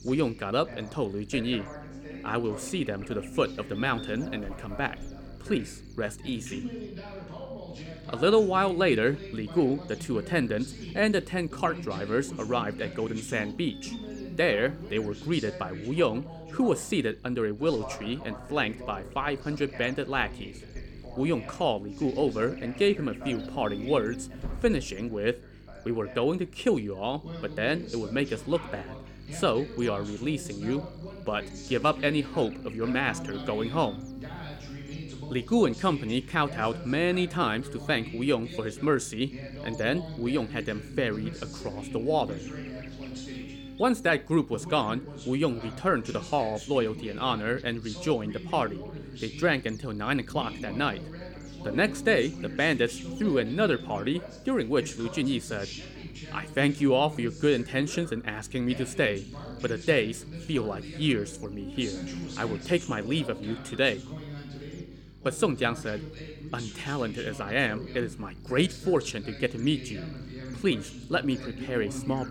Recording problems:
voice in the background; noticeable; throughout; 15 dB below the speech
electrical hum; faint; throughout; 50 Hz, 20 dB below the speech

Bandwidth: 17 kHz